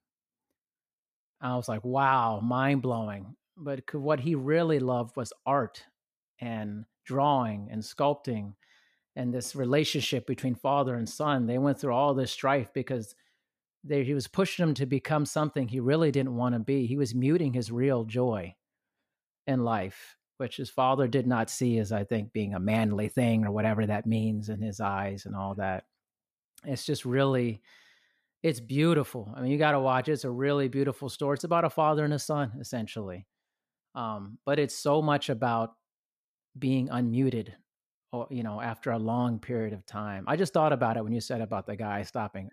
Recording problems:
none

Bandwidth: 14.5 kHz